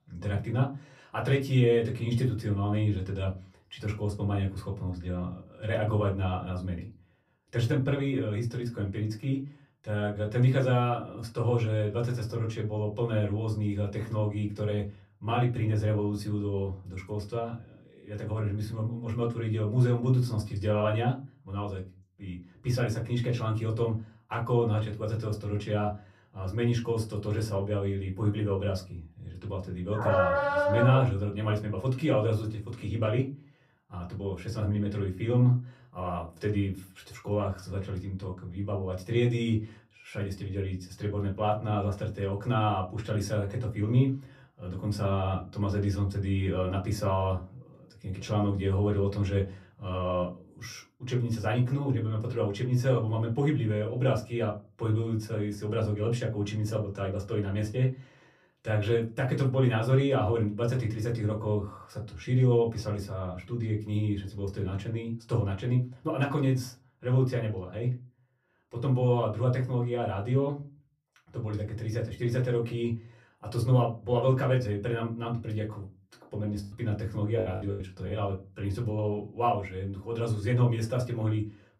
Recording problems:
off-mic speech; far
room echo; very slight; dies away in 0.3 s
dog barking; loud; from 30 to 31 s; peak 4 dB above the speech
choppy; very; from 1:17 to 1:18; 16% of the speech affected

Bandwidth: 14.5 kHz